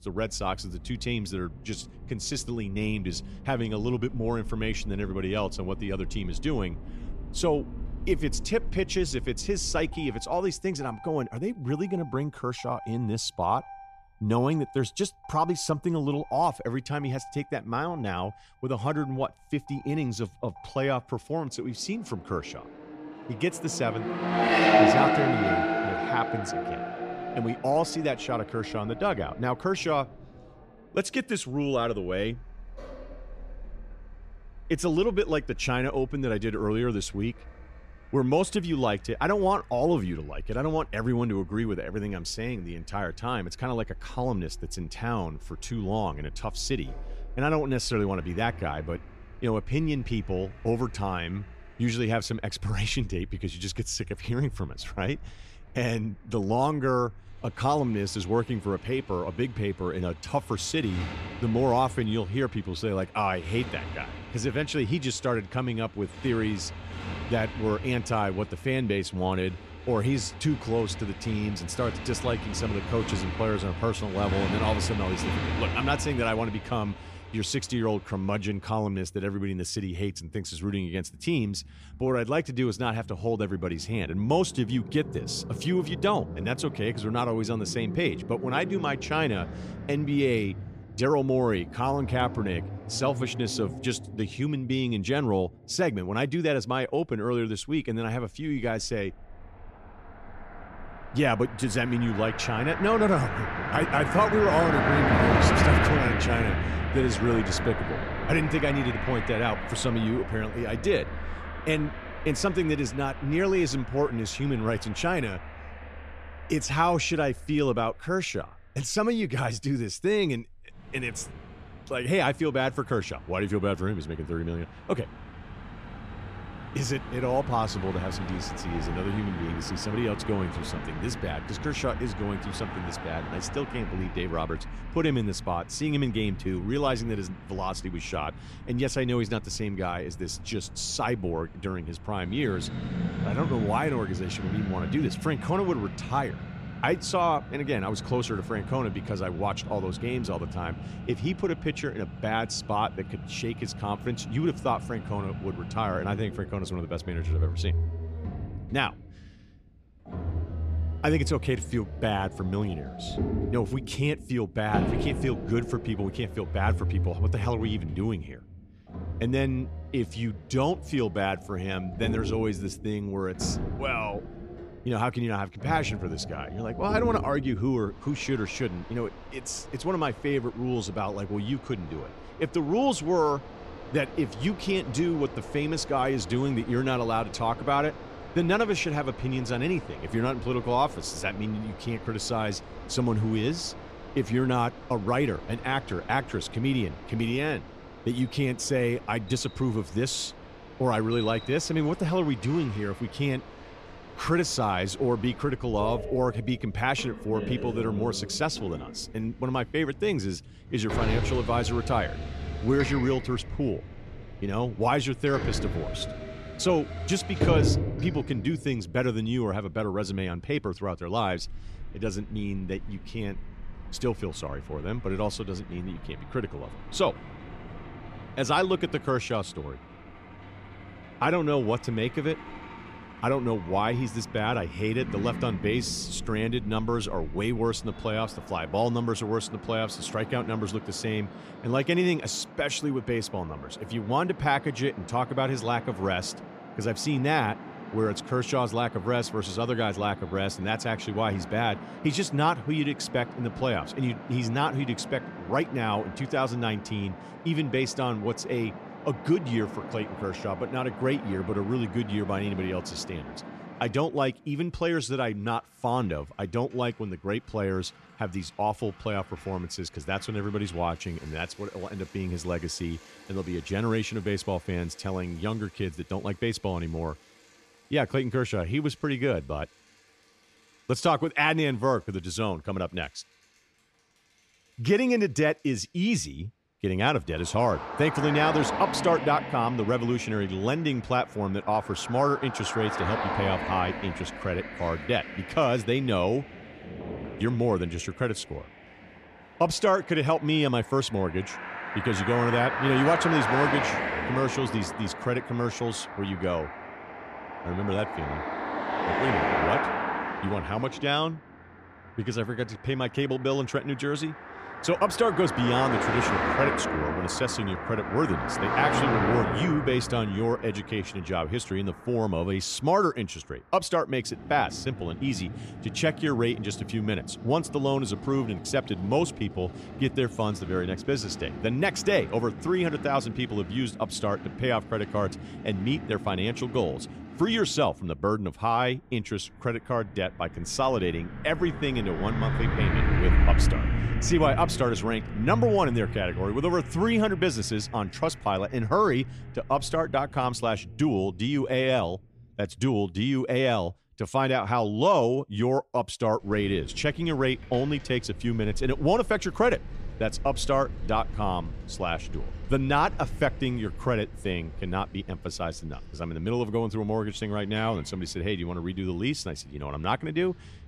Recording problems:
traffic noise; loud; throughout; 6 dB below the speech

